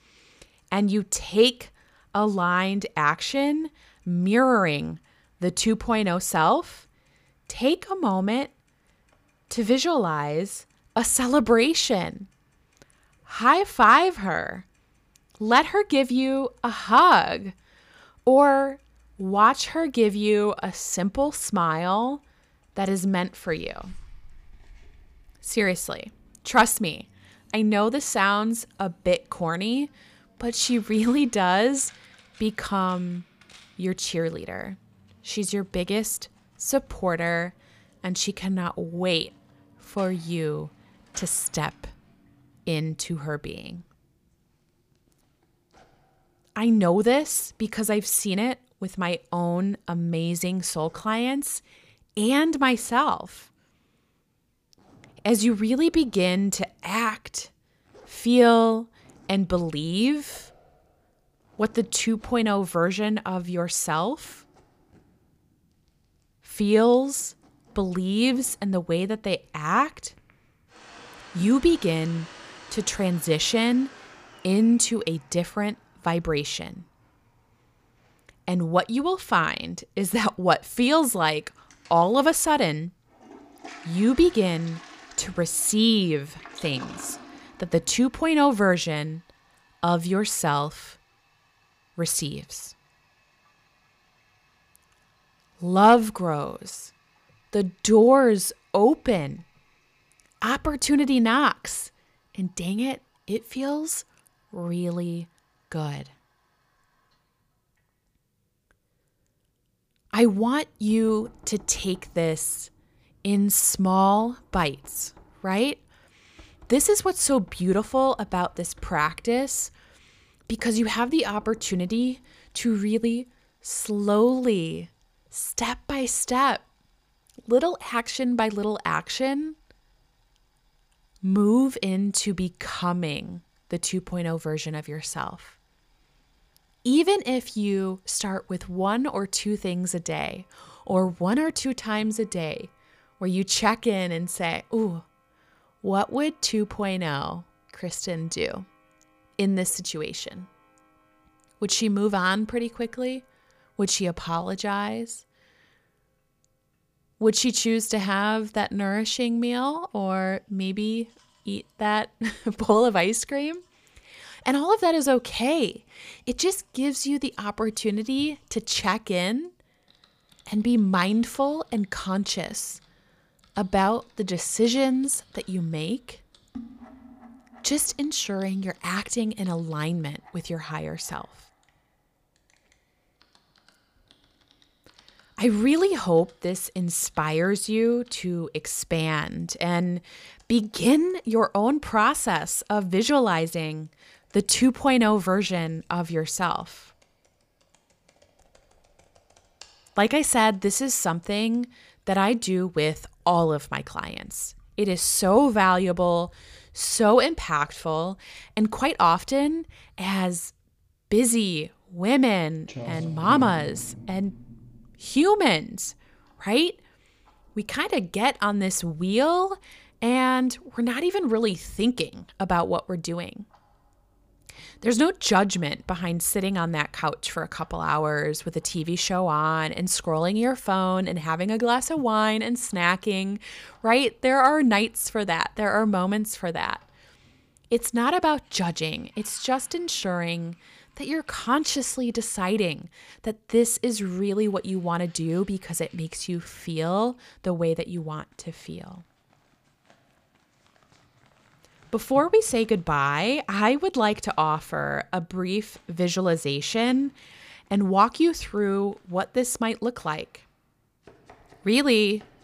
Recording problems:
household noises; faint; throughout; 30 dB below the speech

